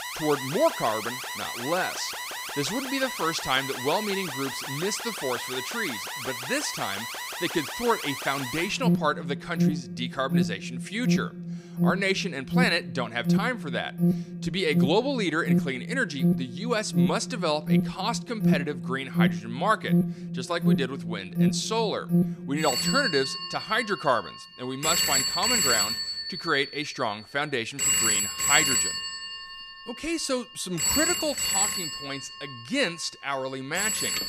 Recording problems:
alarms or sirens; very loud; throughout; 1 dB above the speech

